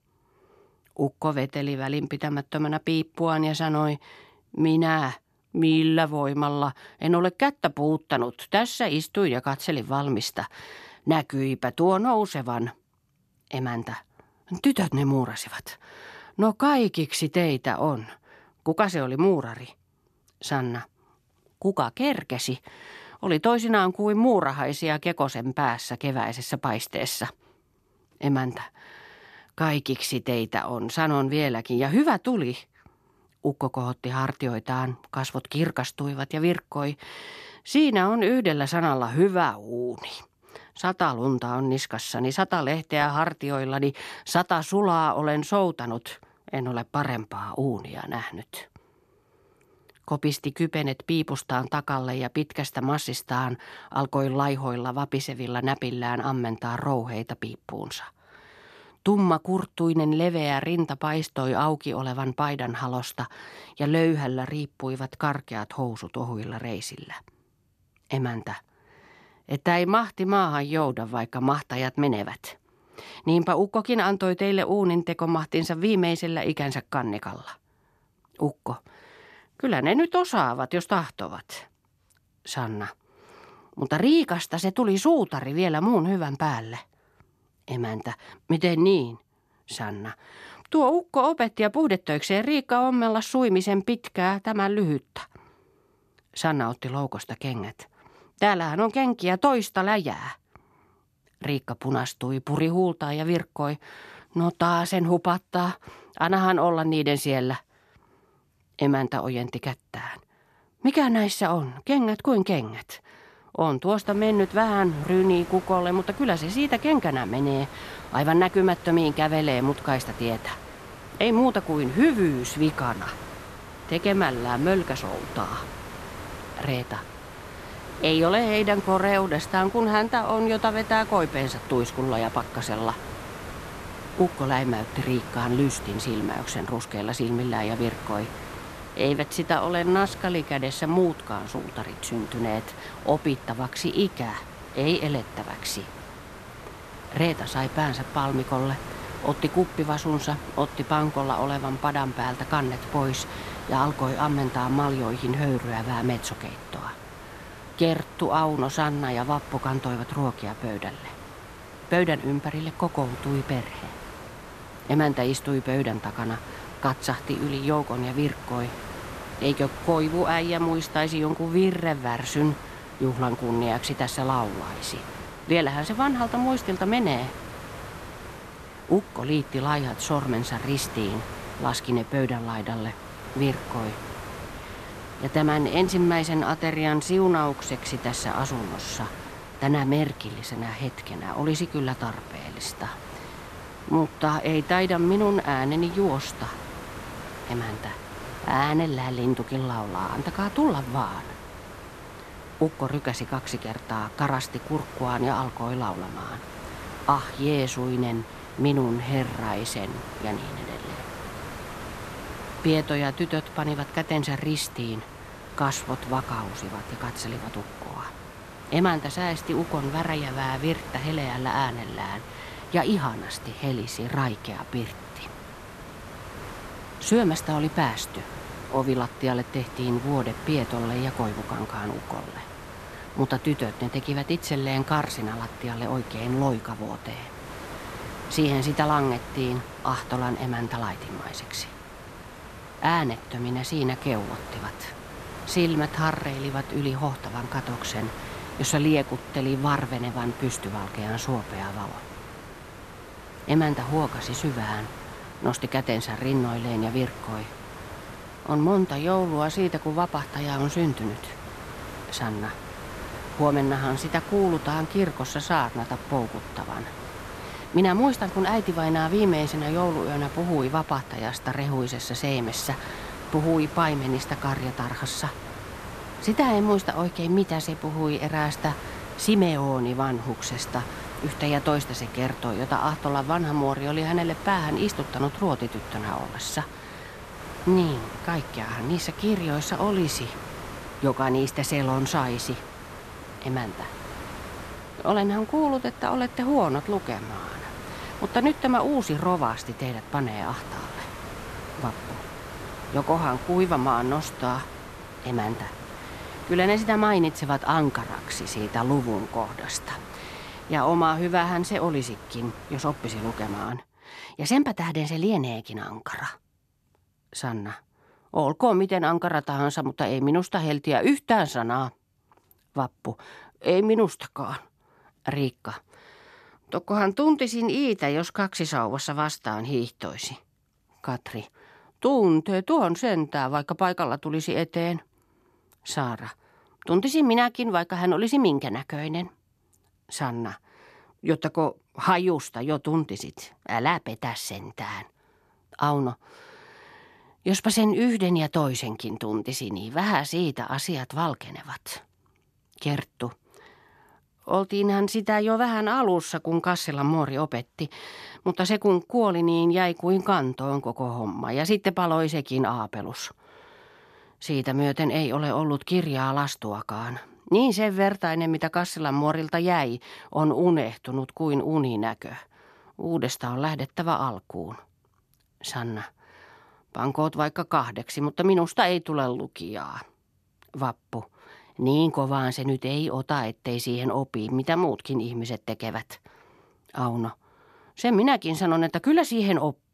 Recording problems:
hiss; noticeable; from 1:54 to 5:14; 15 dB below the speech

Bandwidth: 14 kHz